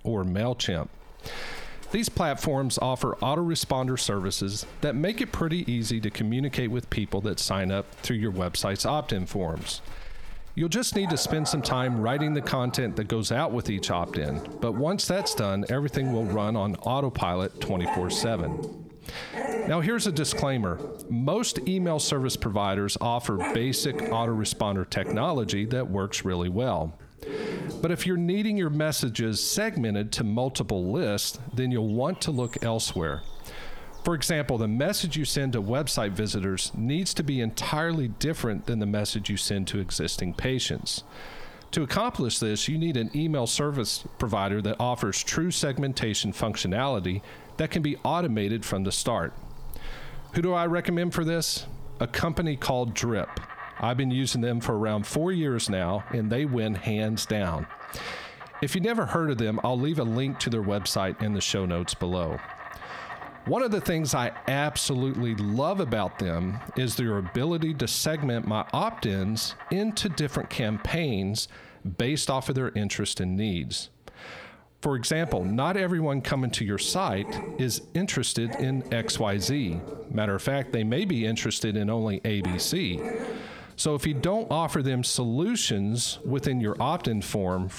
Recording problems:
squashed, flat; heavily, background pumping
animal sounds; noticeable; throughout; 15 dB below the speech

